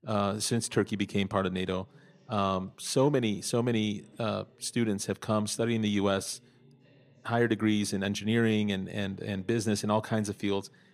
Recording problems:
voice in the background; faint; throughout; 30 dB below the speech

